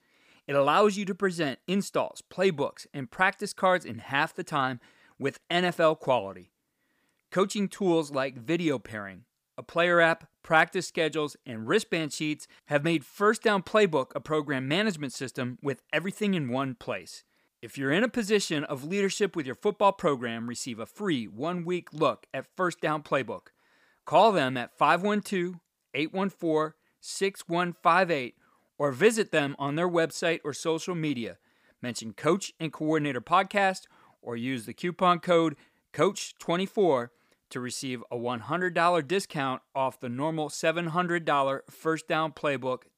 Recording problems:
none

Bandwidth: 15 kHz